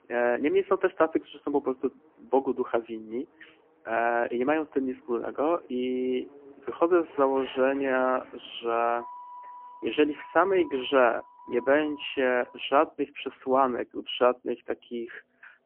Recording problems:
phone-call audio; poor line; nothing above 3 kHz
traffic noise; faint; throughout; 20 dB below the speech

